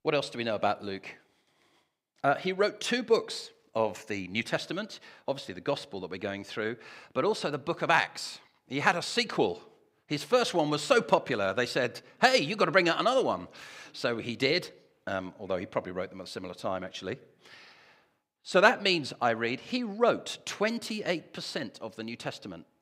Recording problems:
none

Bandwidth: 15.5 kHz